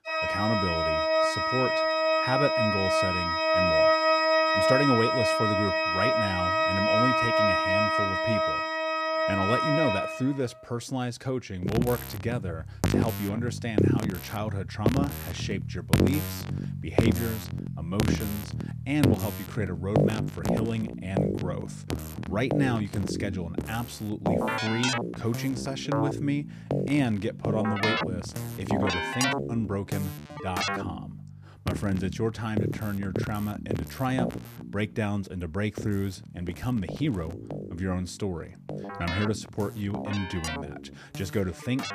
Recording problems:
background music; very loud; throughout; 4 dB above the speech

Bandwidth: 14.5 kHz